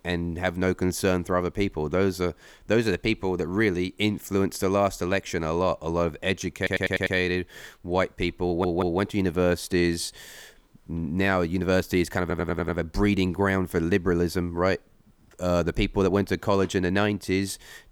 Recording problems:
audio stuttering; at 6.5 s, at 8.5 s and at 12 s

